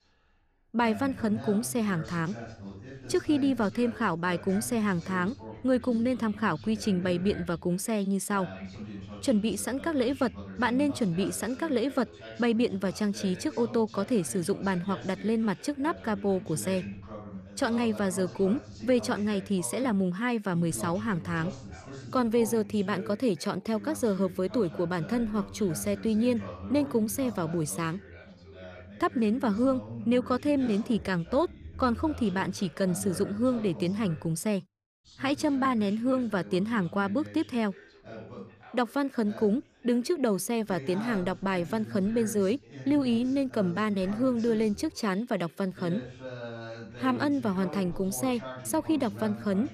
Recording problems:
background chatter; noticeable; throughout; 2 voices, 15 dB below the speech

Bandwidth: 14.5 kHz